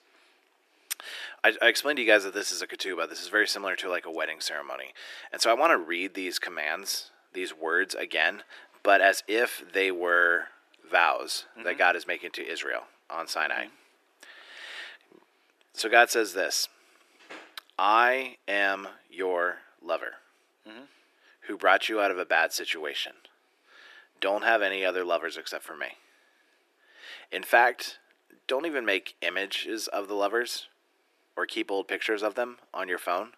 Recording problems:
thin; very; fading below 300 Hz

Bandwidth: 14 kHz